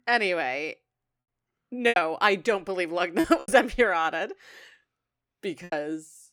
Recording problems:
choppy; very; 7% of the speech affected

